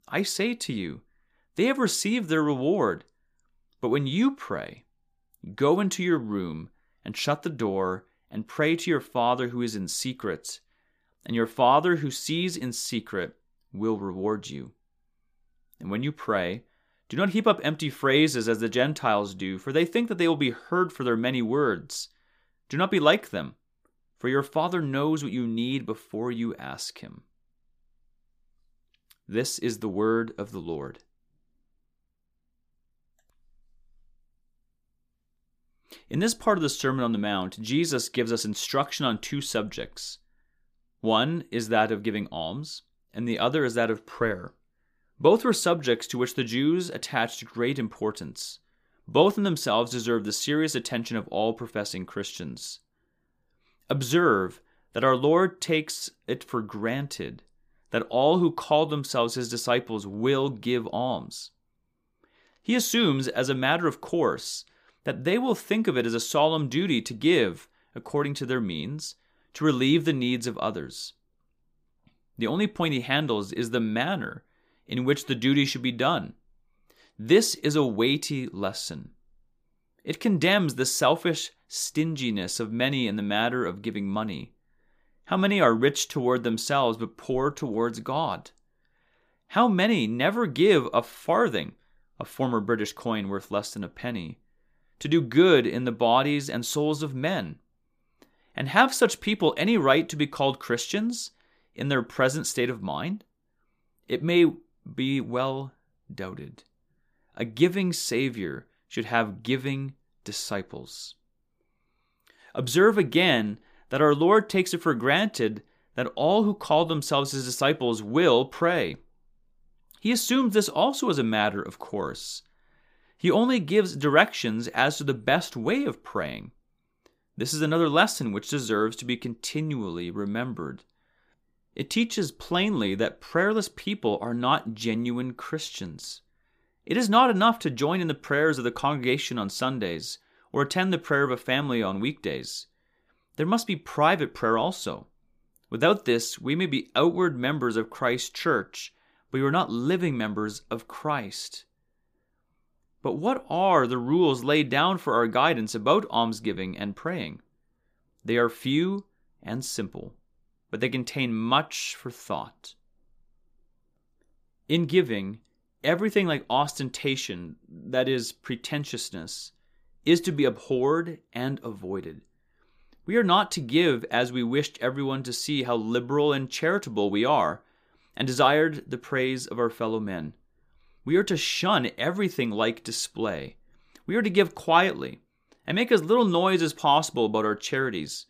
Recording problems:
none

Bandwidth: 15 kHz